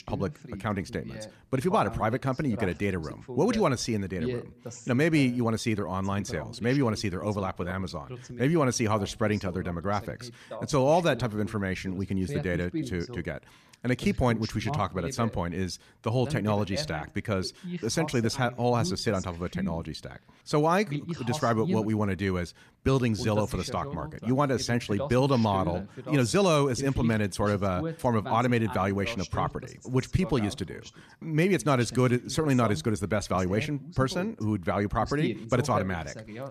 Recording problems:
voice in the background; noticeable; throughout; 10 dB below the speech

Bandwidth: 14.5 kHz